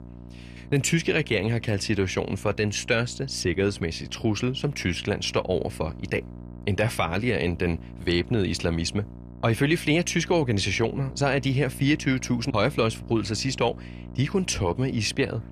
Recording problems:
electrical hum; faint; throughout; 60 Hz, 20 dB below the speech

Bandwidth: 14.5 kHz